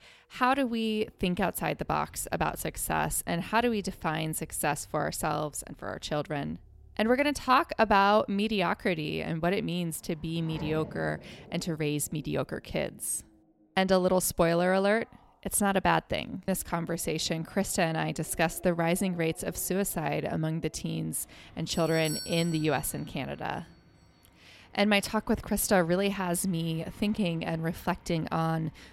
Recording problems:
traffic noise; faint; throughout; 25 dB below the speech
doorbell; noticeable; from 22 to 23 s; peak 6 dB below the speech

